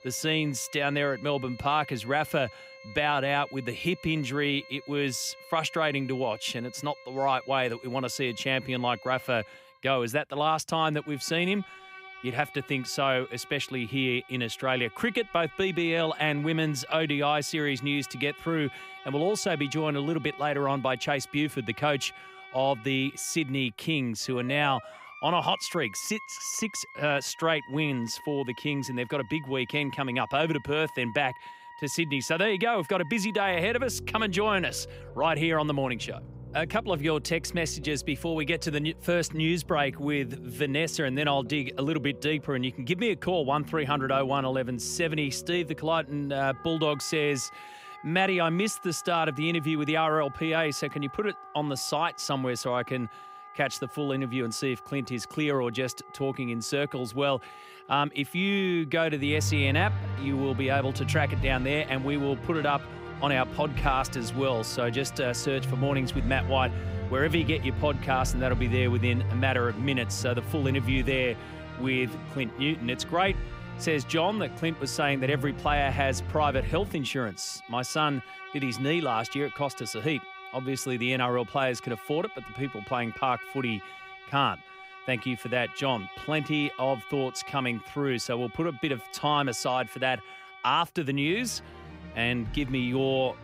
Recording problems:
background music; noticeable; throughout; 10 dB below the speech

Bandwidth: 15.5 kHz